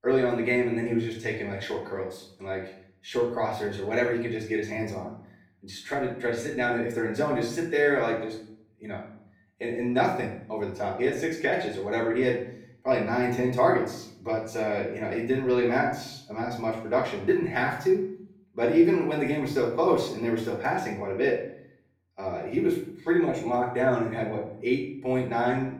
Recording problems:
off-mic speech; far
room echo; noticeable; dies away in 0.5 s

